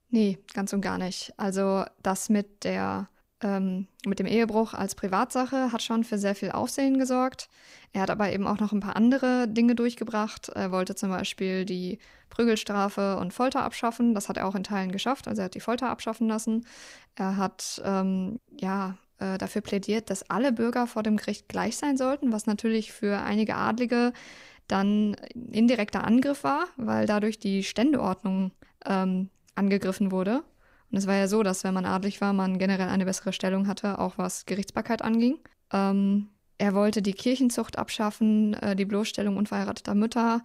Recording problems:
none

